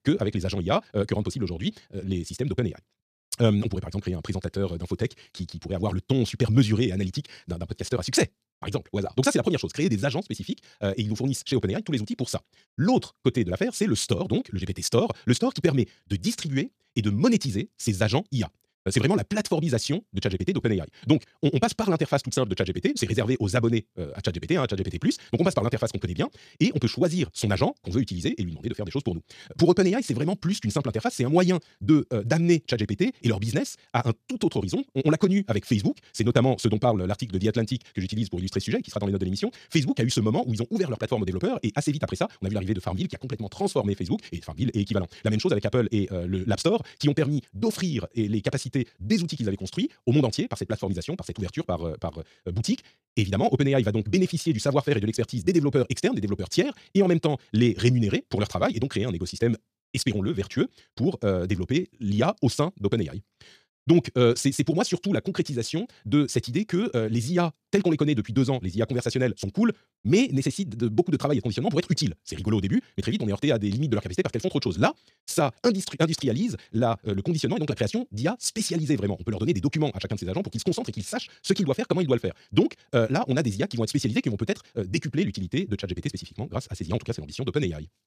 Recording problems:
wrong speed, natural pitch; too fast; 1.8 times normal speed

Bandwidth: 14.5 kHz